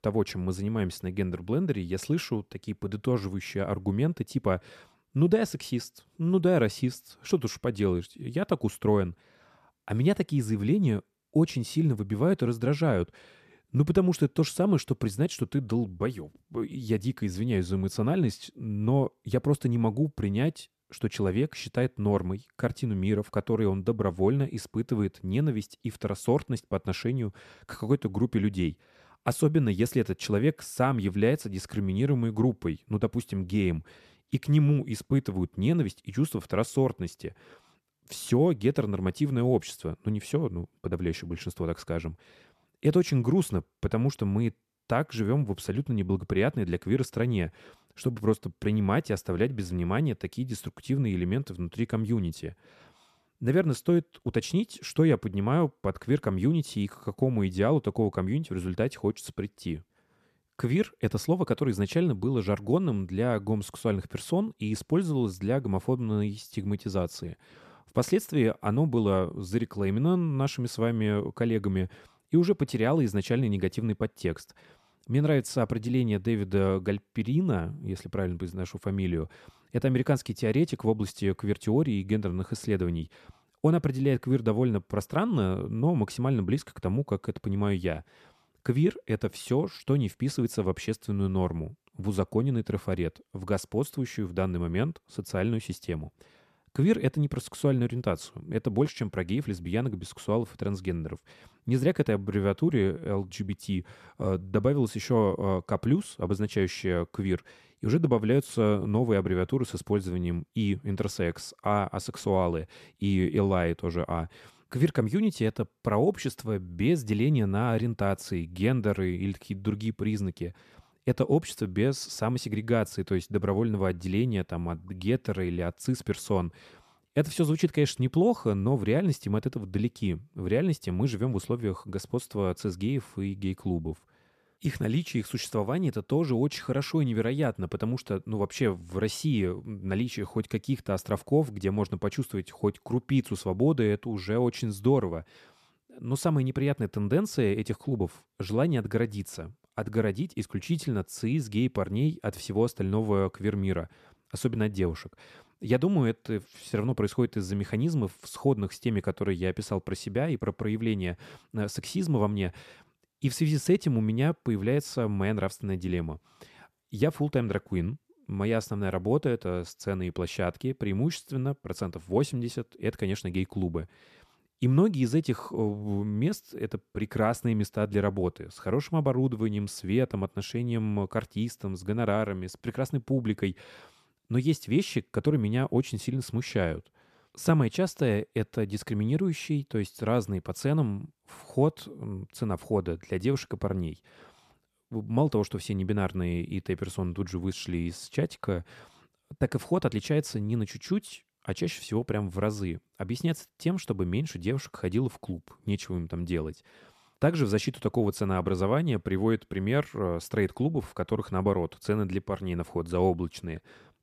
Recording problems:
none

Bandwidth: 14 kHz